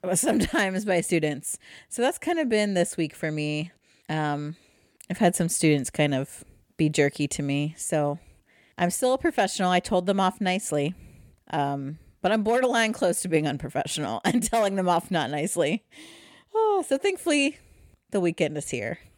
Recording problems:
none

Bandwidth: 18 kHz